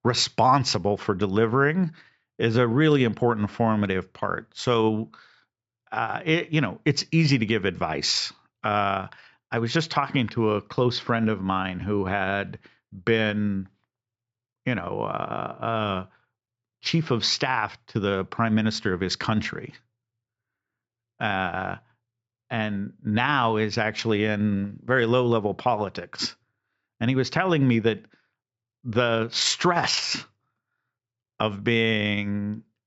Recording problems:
high frequencies cut off; noticeable; nothing above 8 kHz

